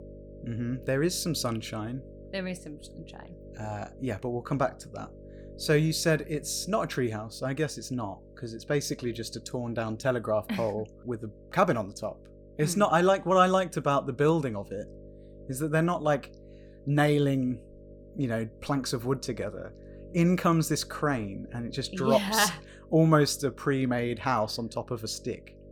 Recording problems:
electrical hum; faint; throughout; 50 Hz, 25 dB below the speech

